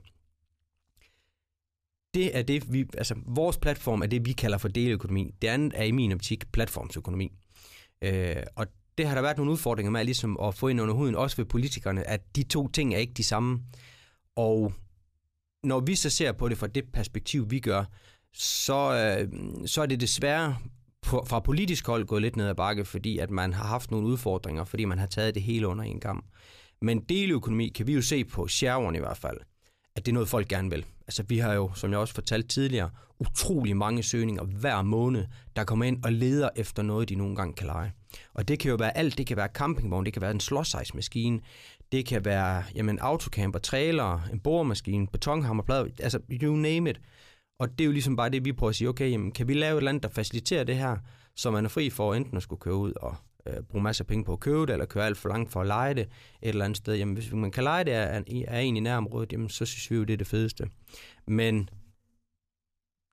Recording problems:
none

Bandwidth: 14.5 kHz